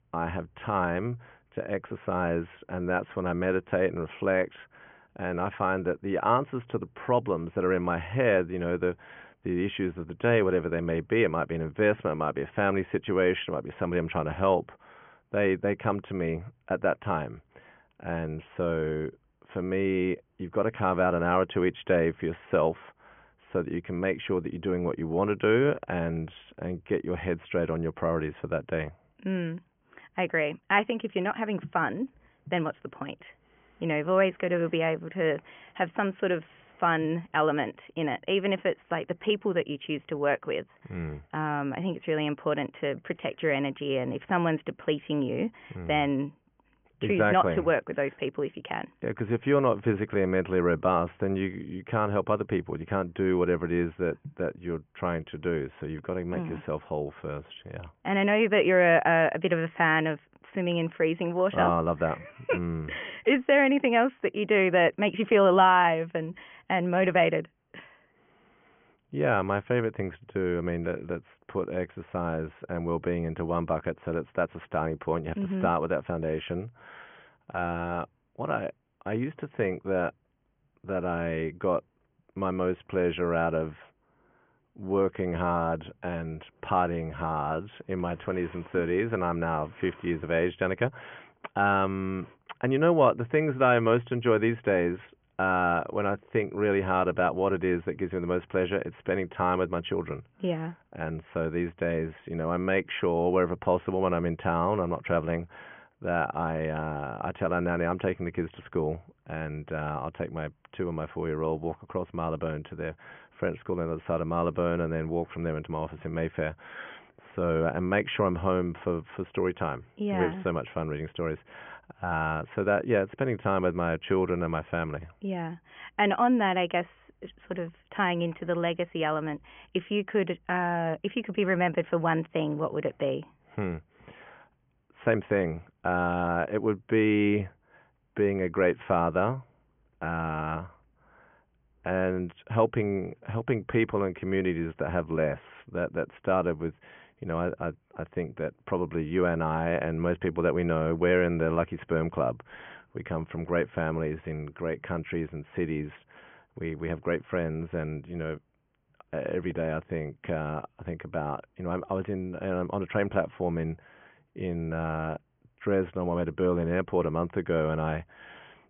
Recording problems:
high frequencies cut off; severe; nothing above 3 kHz

